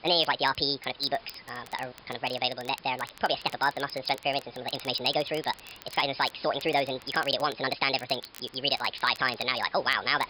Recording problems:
wrong speed and pitch; too fast and too high; 1.5 times normal speed
high frequencies cut off; noticeable; nothing above 5.5 kHz
thin; very slightly; fading below 900 Hz
hiss; faint; throughout; 25 dB below the speech
crackle, like an old record; faint; 20 dB below the speech

